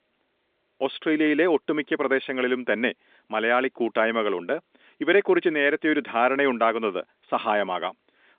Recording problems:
phone-call audio; nothing above 3.5 kHz

